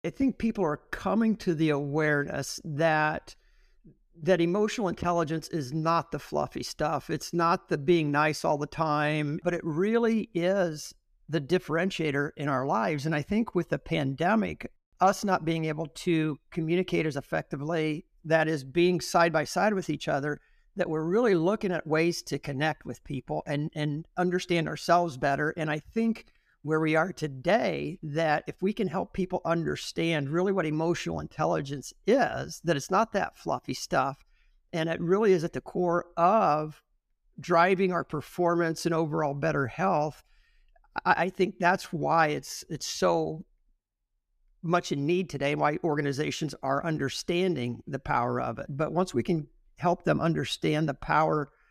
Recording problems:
none

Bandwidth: 14.5 kHz